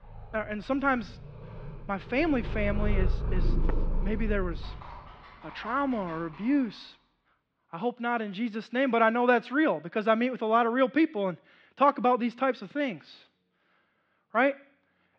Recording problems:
muffled; slightly; fading above 4 kHz
animal sounds; loud; until 6.5 s; 8 dB below the speech

